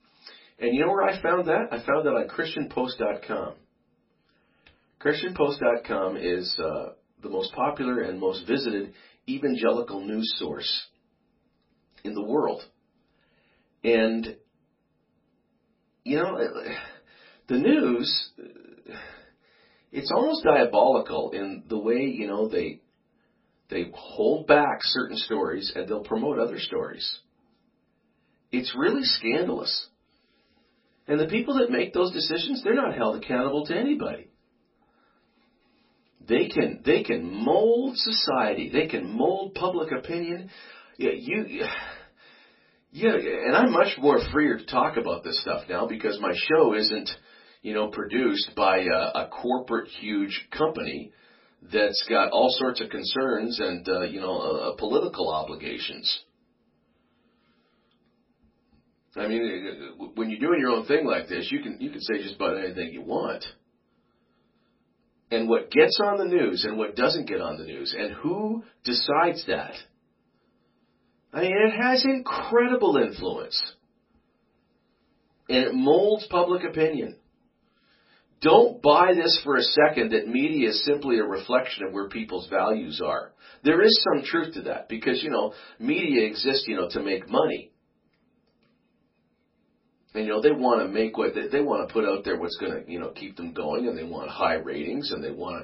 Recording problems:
off-mic speech; far
garbled, watery; badly; nothing above 5.5 kHz
room echo; very slight; dies away in 0.2 s

